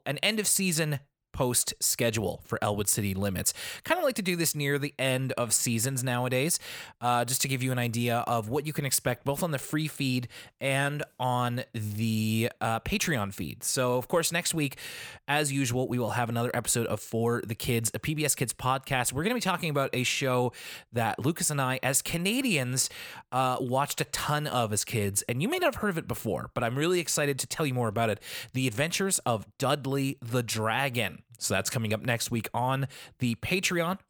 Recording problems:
none

